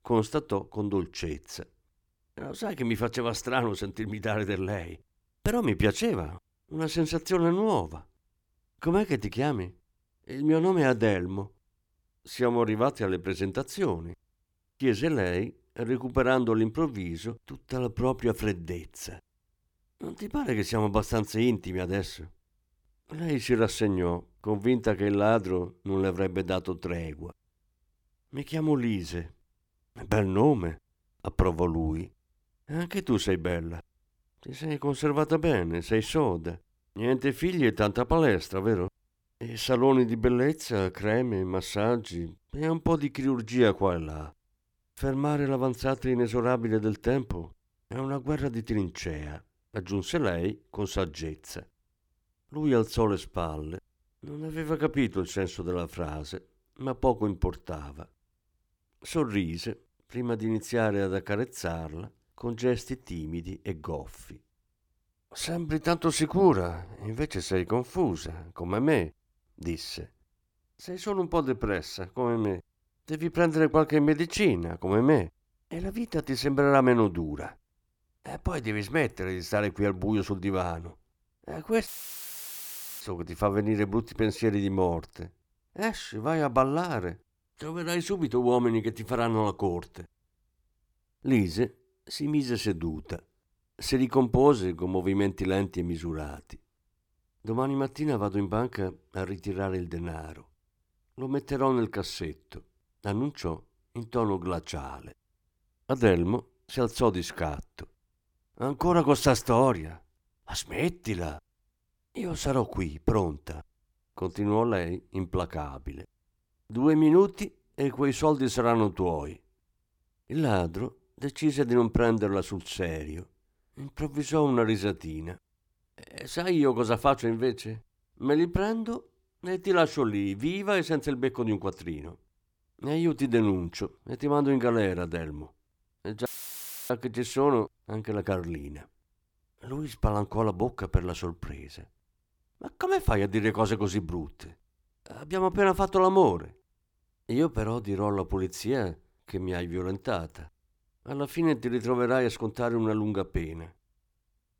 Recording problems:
audio cutting out; filled with static; at 1:22 for 1 s and at 2:16 for 0.5 s

